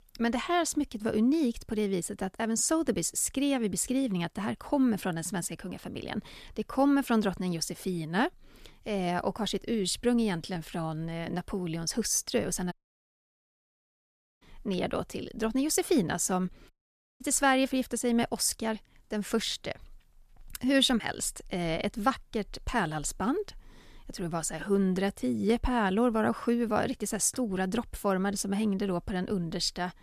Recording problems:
audio cutting out; at 13 s for 1.5 s and at 17 s for 0.5 s

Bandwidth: 14.5 kHz